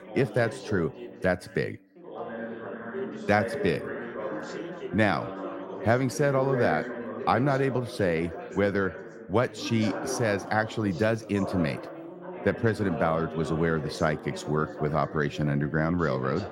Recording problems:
background chatter; loud; throughout; 4 voices, 9 dB below the speech

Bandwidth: 16 kHz